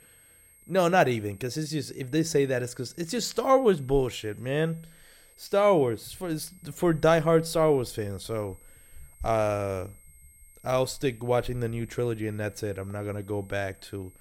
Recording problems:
high-pitched whine; faint; throughout; 8.5 kHz, 25 dB below the speech

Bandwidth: 16.5 kHz